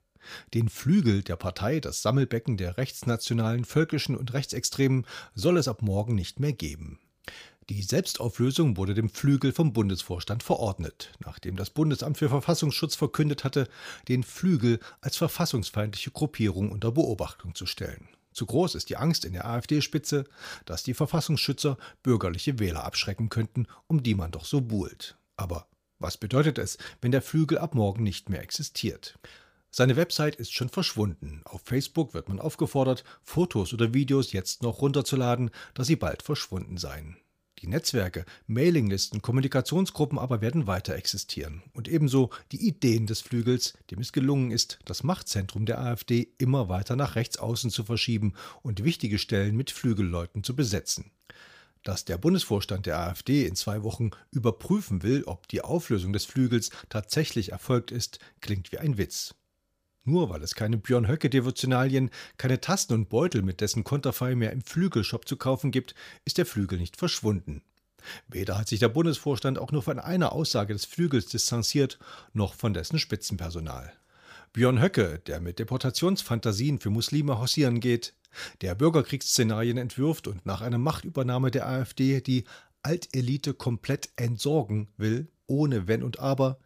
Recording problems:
none

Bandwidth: 15 kHz